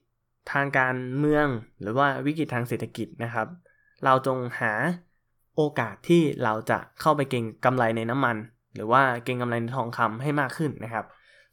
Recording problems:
none

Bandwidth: 17.5 kHz